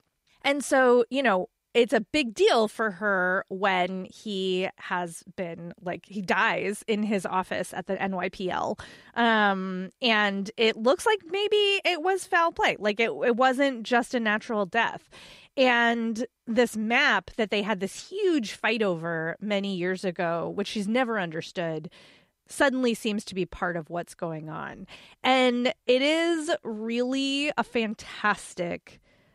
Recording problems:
none

